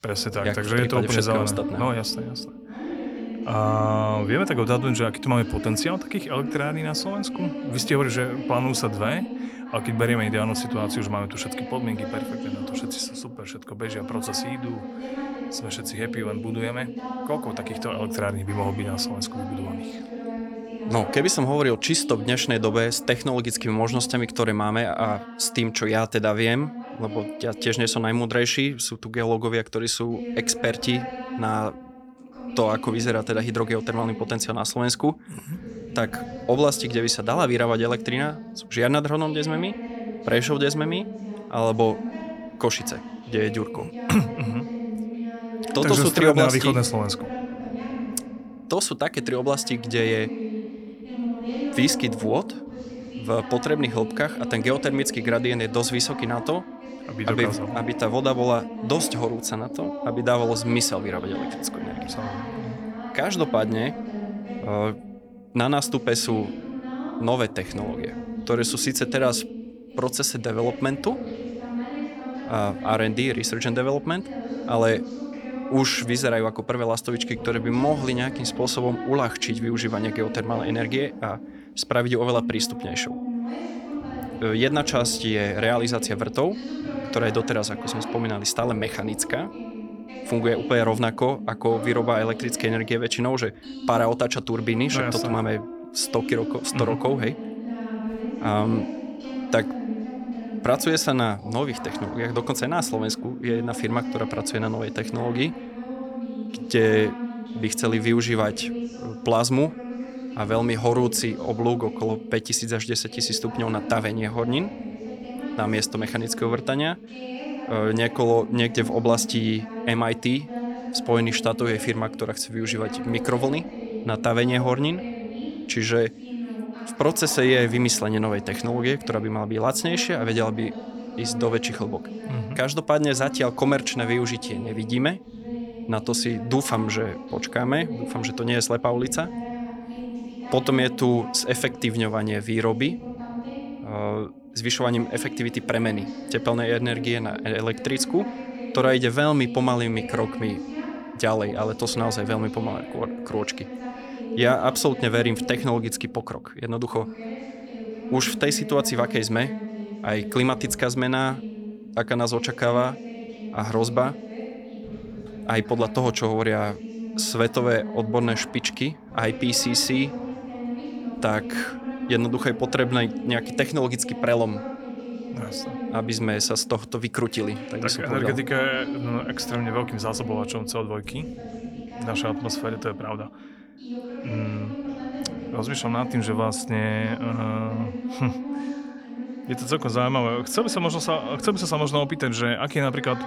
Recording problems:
voice in the background; loud; throughout; 9 dB below the speech

